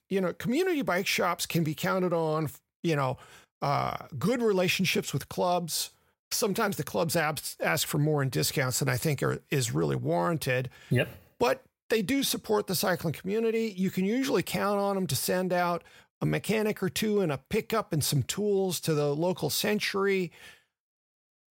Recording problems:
none

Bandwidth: 16 kHz